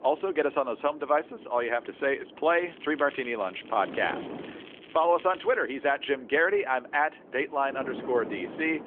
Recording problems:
phone-call audio; nothing above 3.5 kHz
wind noise on the microphone; occasional gusts; 20 dB below the speech
crackling; faint; from 2.5 to 5.5 s; 20 dB below the speech

